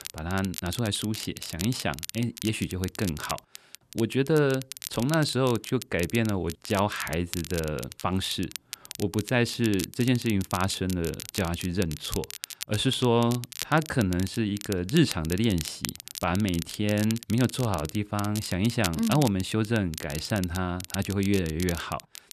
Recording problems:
crackle, like an old record; noticeable; 10 dB below the speech

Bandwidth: 13.5 kHz